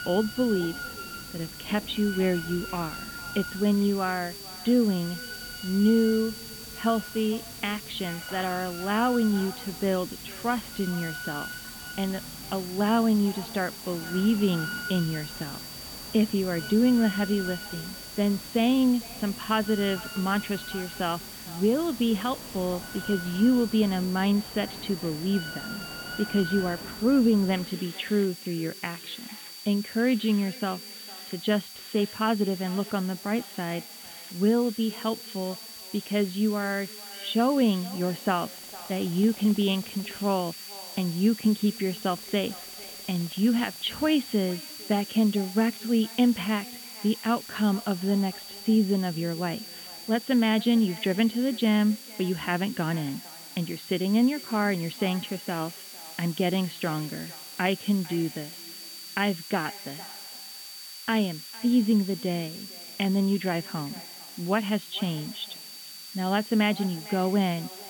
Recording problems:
muffled; very; fading above 3.5 kHz
echo of what is said; faint; throughout; 450 ms later, 25 dB below the speech
high-pitched whine; noticeable; throughout; 4.5 kHz, 15 dB below the speech
machinery noise; noticeable; throughout; 15 dB below the speech
hiss; noticeable; throughout; 15 dB below the speech

